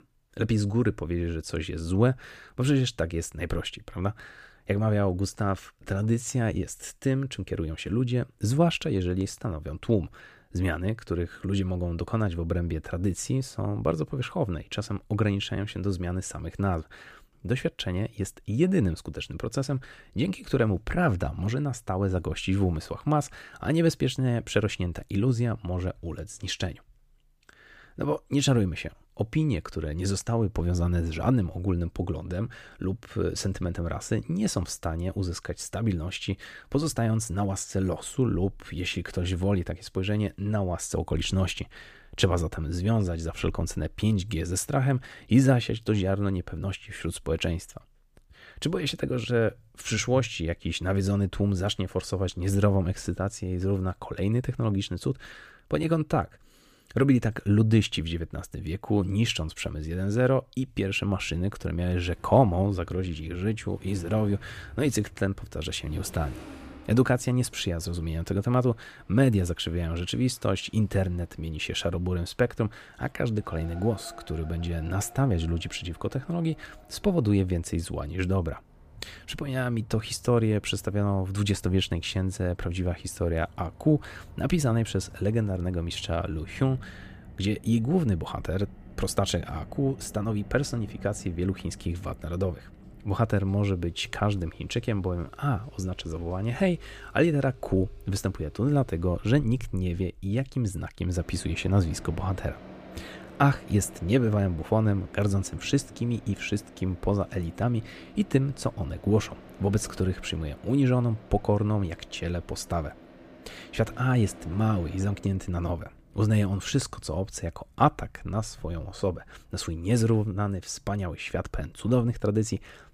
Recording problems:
traffic noise; faint; from 1:02 on; 20 dB below the speech

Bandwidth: 15 kHz